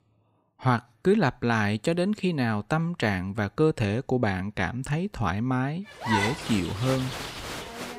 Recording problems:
crowd noise; loud; from 6 s on; 5 dB below the speech

